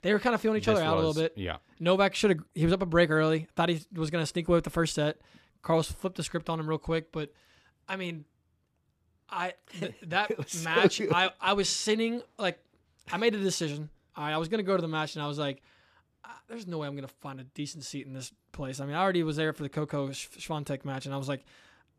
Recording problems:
none

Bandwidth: 14.5 kHz